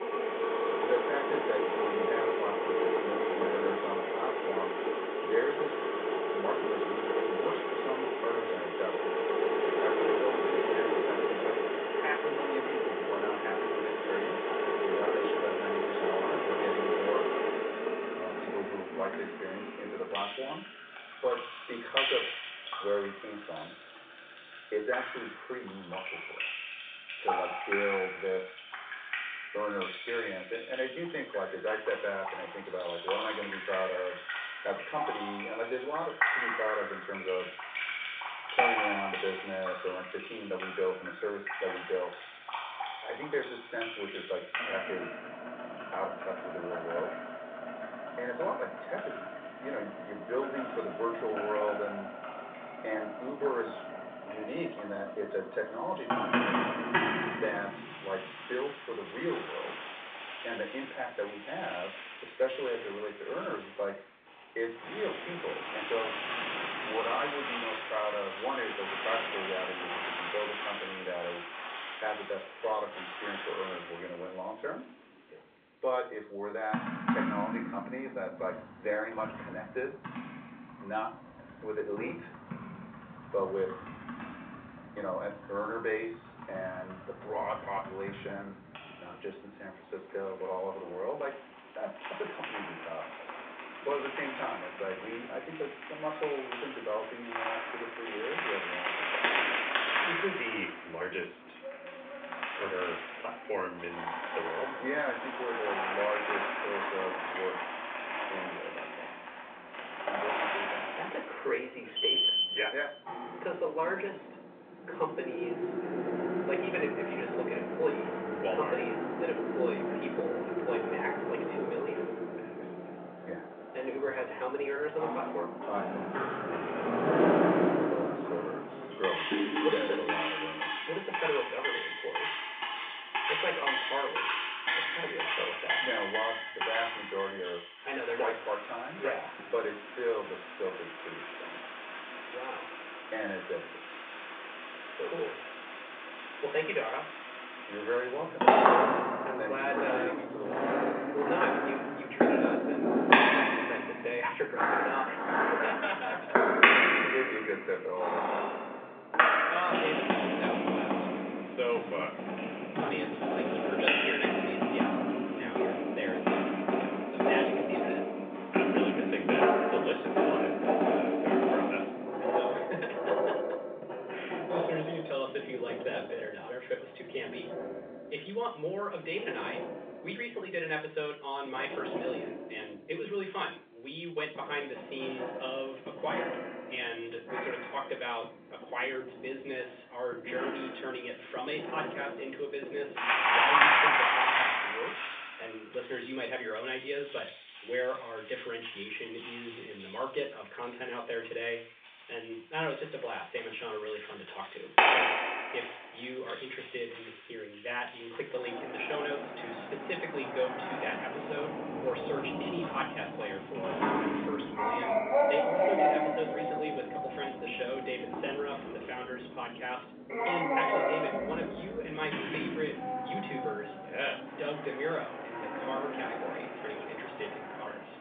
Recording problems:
off-mic speech; far
room echo; slight; dies away in 0.3 s
phone-call audio; nothing above 3.5 kHz
household noises; very loud; throughout; 5 dB above the speech

